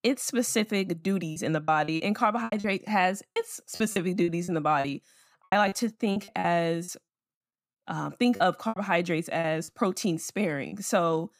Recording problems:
choppy; very; 11% of the speech affected

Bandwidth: 15 kHz